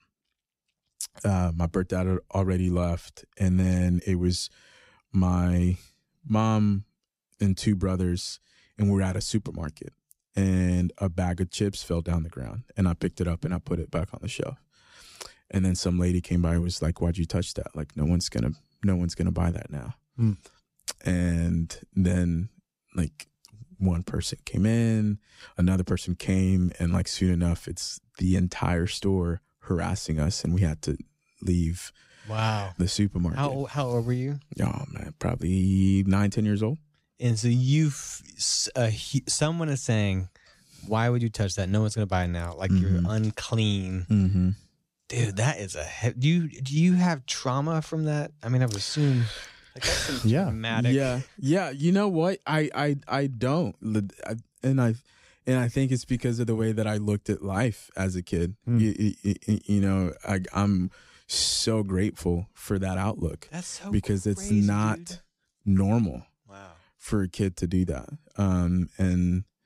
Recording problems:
uneven, jittery; strongly; from 3.5 s to 1:06

